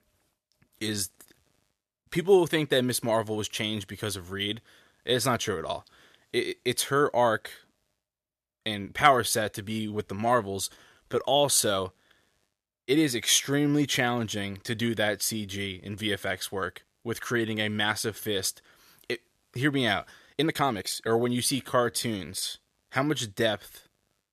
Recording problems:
uneven, jittery; strongly; from 11 to 22 s

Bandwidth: 14.5 kHz